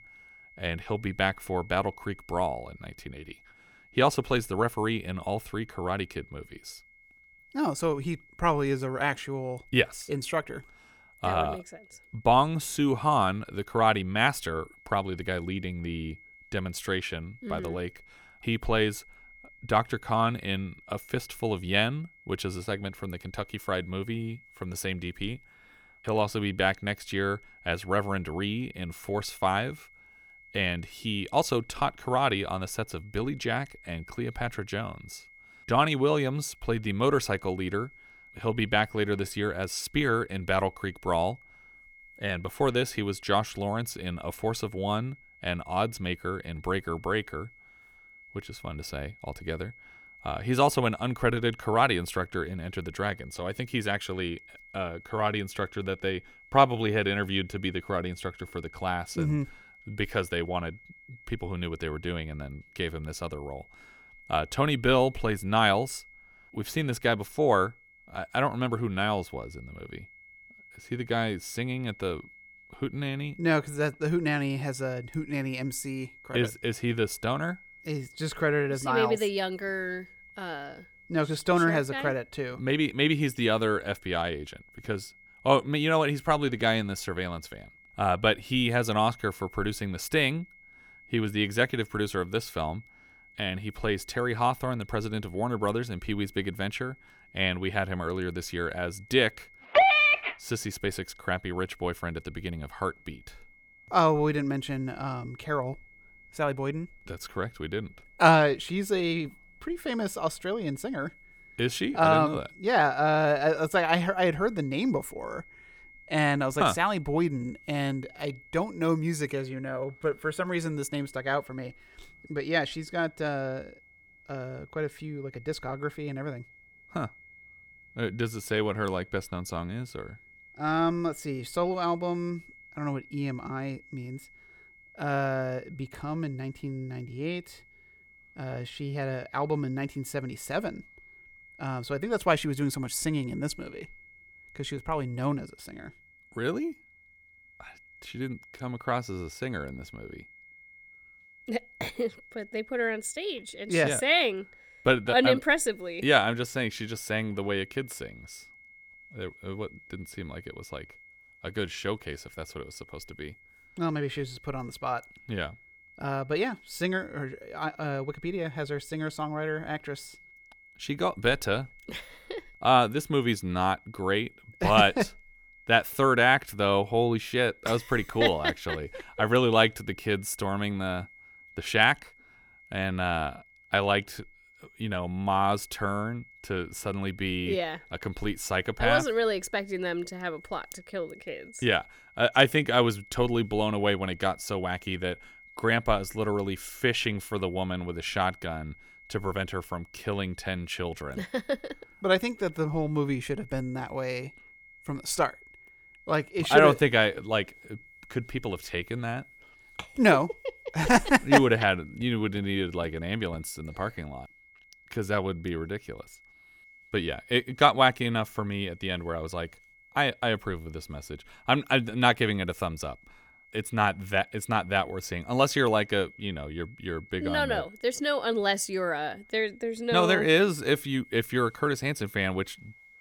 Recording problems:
high-pitched whine; faint; throughout; 2 kHz, 25 dB below the speech

